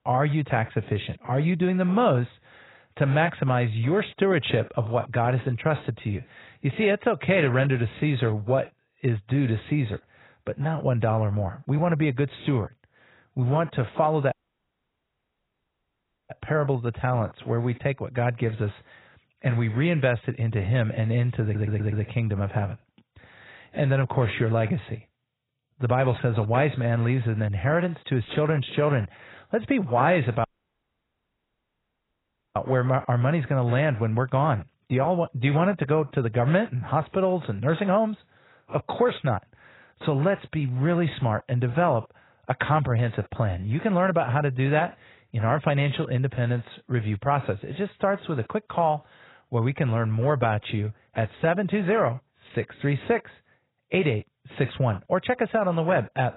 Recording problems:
garbled, watery; badly; nothing above 4 kHz
audio cutting out; at 14 s for 2 s and at 30 s for 2 s
audio stuttering; at 21 s

